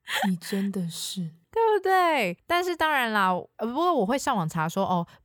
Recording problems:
none

